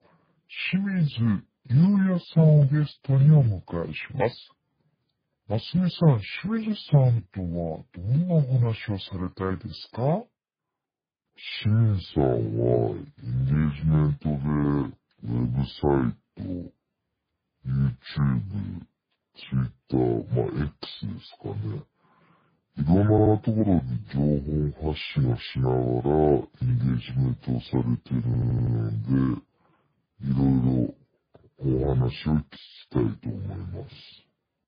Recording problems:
garbled, watery; badly; nothing above 4.5 kHz
wrong speed and pitch; too slow and too low; 0.6 times normal speed
audio stuttering; at 23 s and at 28 s

